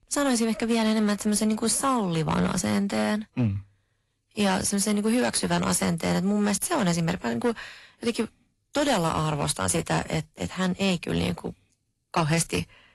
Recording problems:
distortion; slight; 7% of the sound clipped
garbled, watery; slightly; nothing above 11.5 kHz

